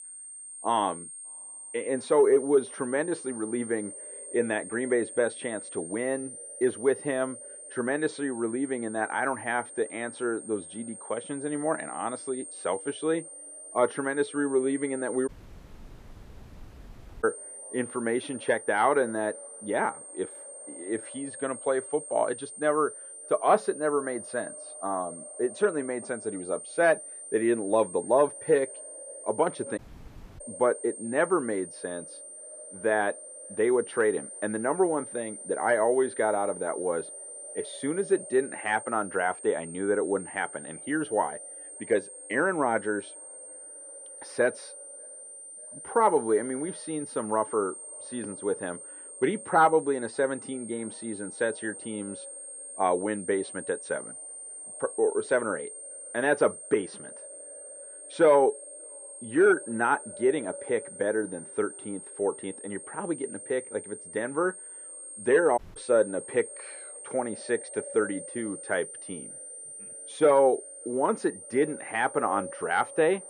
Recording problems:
muffled; very; fading above 3 kHz
echo of what is said; faint; throughout; 590 ms later, 25 dB below the speech
thin; very slightly; fading below 1 kHz
high-pitched whine; noticeable; throughout; 8.5 kHz, 10 dB below the speech
audio cutting out; at 15 s for 2 s, at 30 s for 0.5 s and at 1:06

